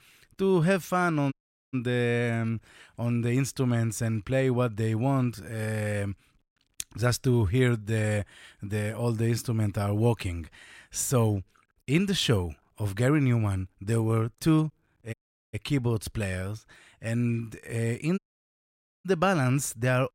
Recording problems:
audio cutting out; at 1.5 s, at 15 s and at 18 s for 1 s

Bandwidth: 16 kHz